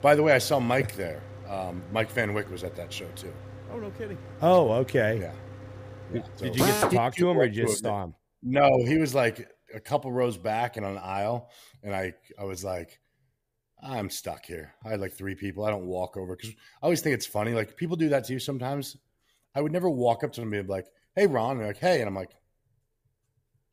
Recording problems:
machinery noise; loud; until 6.5 s; 8 dB below the speech

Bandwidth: 15 kHz